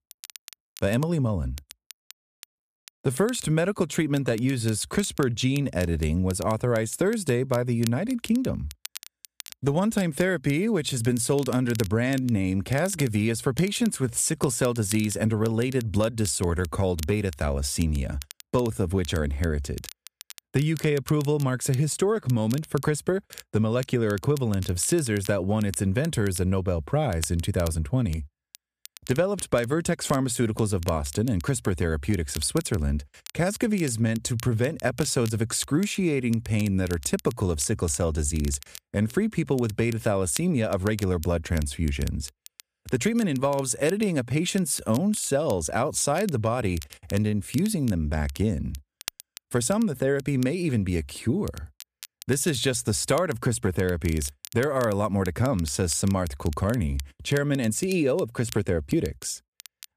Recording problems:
crackle, like an old record; noticeable; 20 dB below the speech

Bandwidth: 14.5 kHz